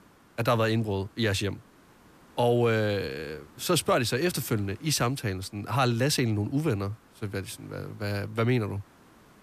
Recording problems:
hiss; faint; throughout; 30 dB below the speech

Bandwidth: 14.5 kHz